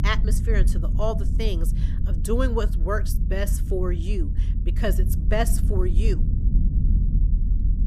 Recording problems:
low rumble; noticeable; throughout; 10 dB below the speech

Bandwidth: 14.5 kHz